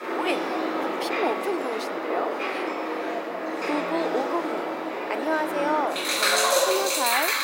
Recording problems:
thin; very slightly; fading below 300 Hz
rain or running water; very loud; throughout; 4 dB above the speech

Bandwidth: 16 kHz